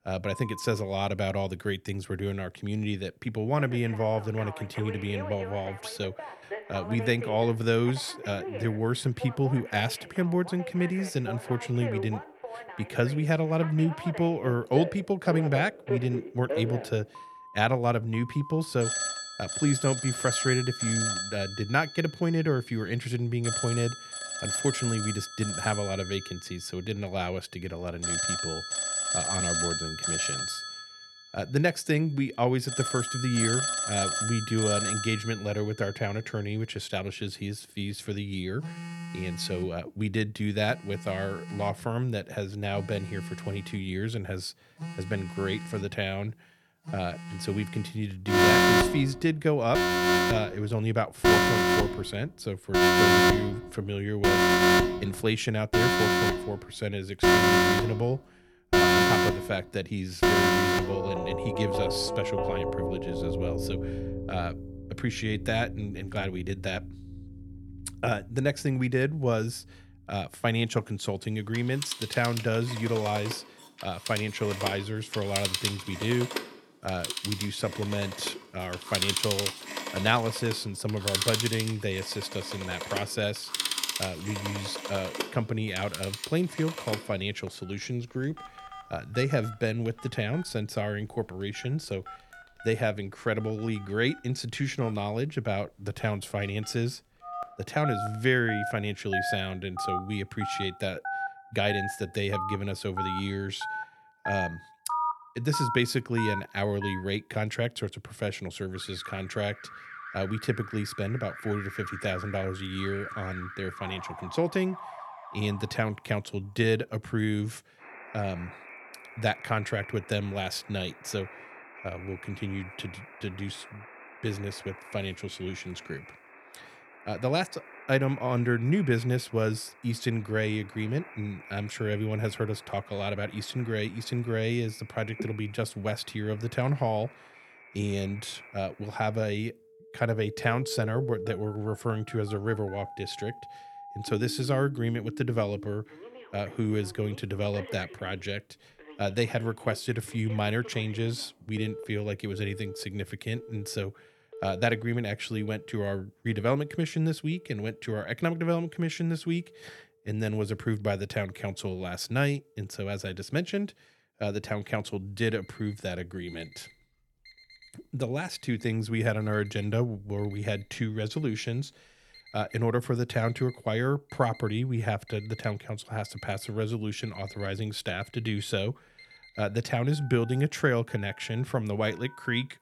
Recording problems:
alarms or sirens; very loud; throughout; as loud as the speech

